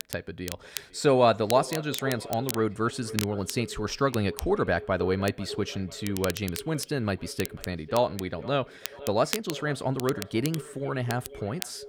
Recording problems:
echo of what is said; noticeable; throughout; 490 ms later, 15 dB below the speech
crackle, like an old record; noticeable; 10 dB below the speech

